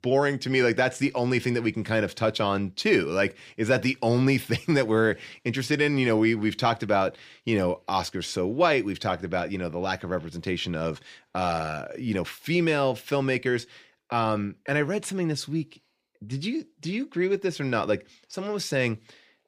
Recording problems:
none

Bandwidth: 15 kHz